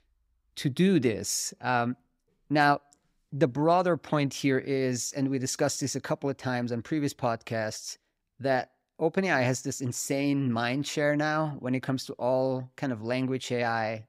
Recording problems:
none

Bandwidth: 15.5 kHz